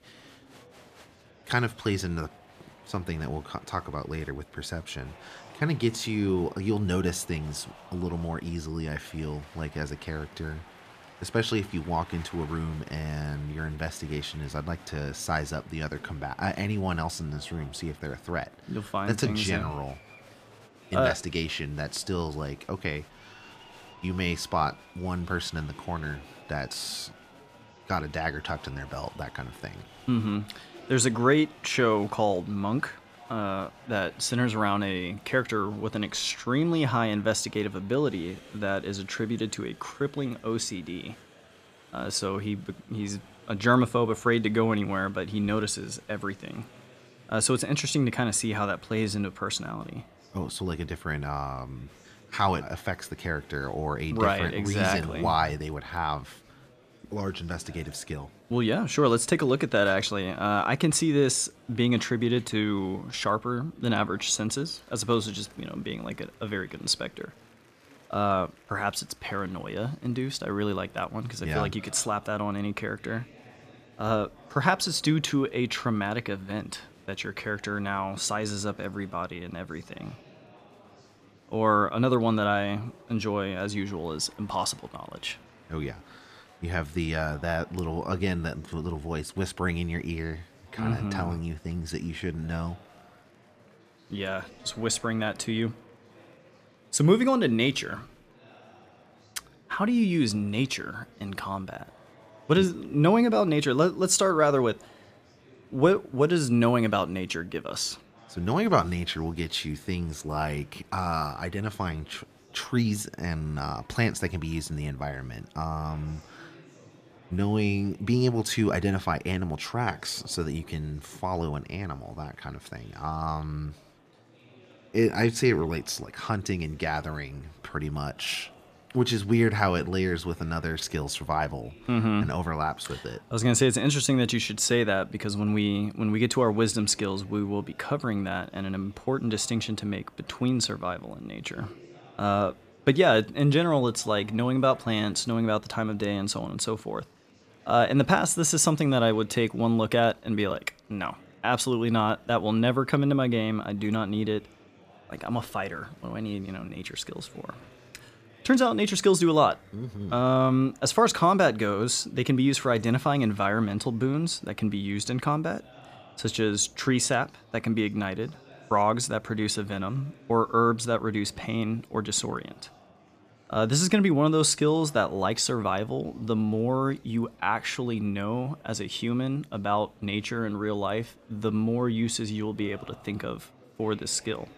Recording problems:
murmuring crowd; faint; throughout; 25 dB below the speech

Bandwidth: 14.5 kHz